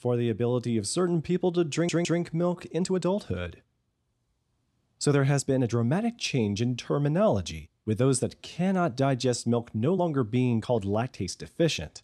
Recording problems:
uneven, jittery; strongly; from 1.5 to 11 s
audio stuttering; at 1.5 s

